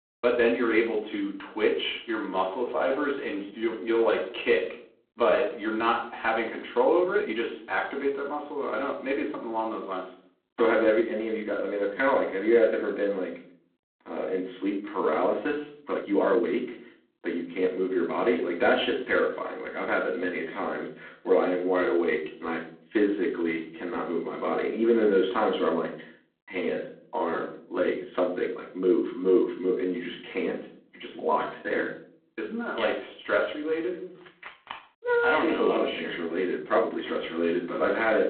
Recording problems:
phone-call audio; poor line
off-mic speech; far
room echo; slight; dies away in 0.4 s
uneven, jittery; strongly; from 2.5 to 37 s
phone ringing; faint; at 34 s; peak 15 dB below the speech

